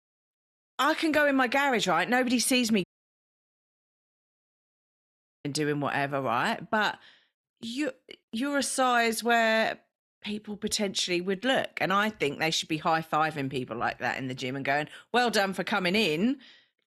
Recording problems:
audio cutting out; at 3 s for 2.5 s

